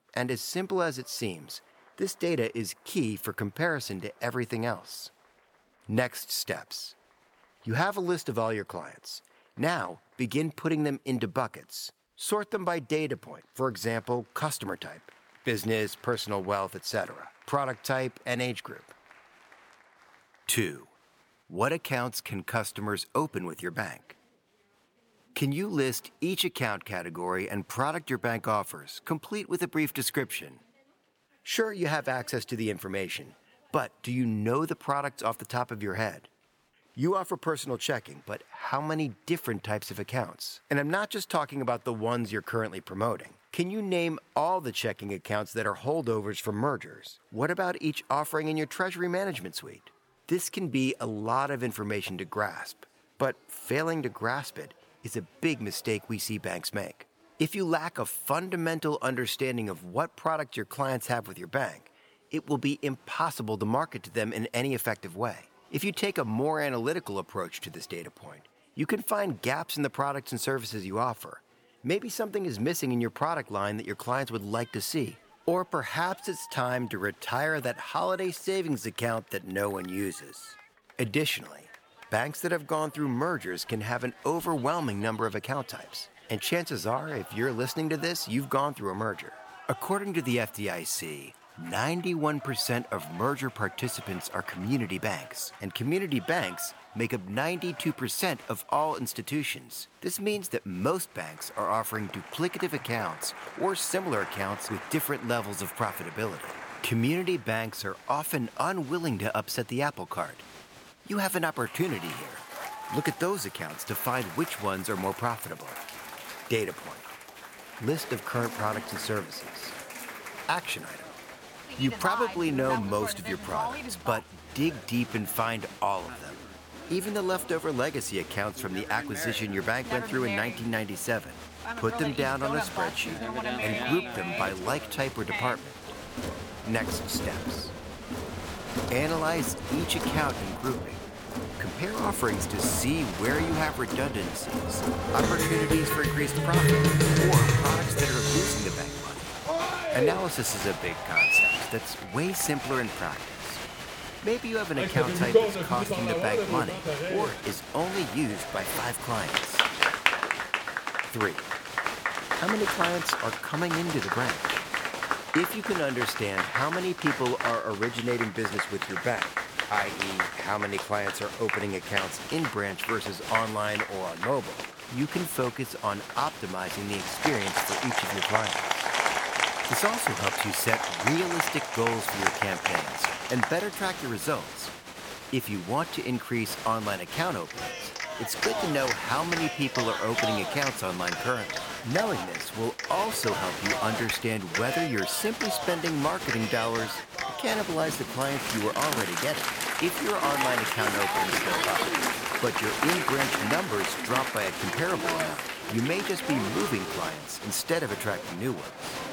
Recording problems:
crowd noise; very loud; throughout; as loud as the speech

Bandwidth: 18 kHz